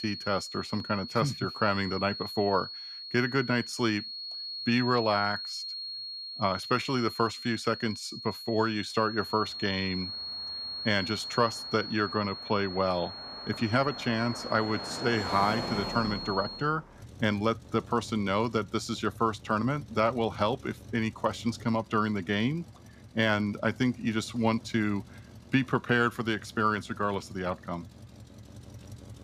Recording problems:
high-pitched whine; loud; until 17 s; 4.5 kHz, 8 dB below the speech
traffic noise; noticeable; from 9 s on; 15 dB below the speech

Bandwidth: 14.5 kHz